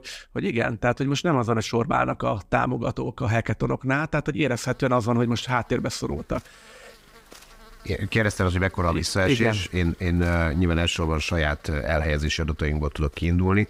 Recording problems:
electrical hum; faint; from 4.5 s on; 50 Hz, 25 dB below the speech

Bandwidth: 15.5 kHz